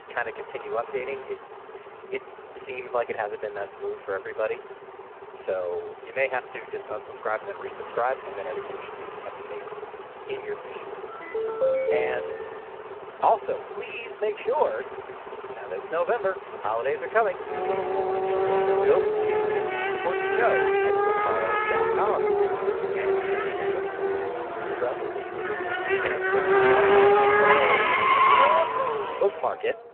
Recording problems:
phone-call audio; poor line
traffic noise; very loud; throughout; 7 dB above the speech
phone ringing; loud; from 11 to 13 s; peak 6 dB above the speech

